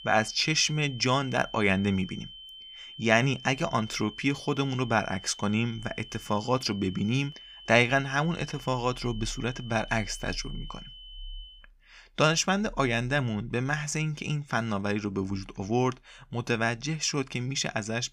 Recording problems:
high-pitched whine; noticeable; until 12 s; 3 kHz, 15 dB below the speech

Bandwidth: 15.5 kHz